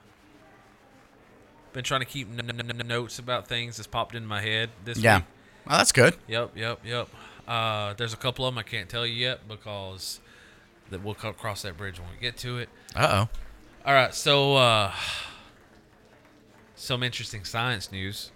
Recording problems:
murmuring crowd; faint; throughout; 30 dB below the speech
audio stuttering; at 2.5 s

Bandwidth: 16.5 kHz